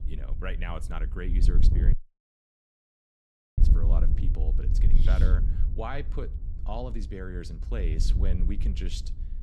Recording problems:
wind noise on the microphone; heavy; 6 dB below the speech
audio cutting out; at 2 s for 1.5 s

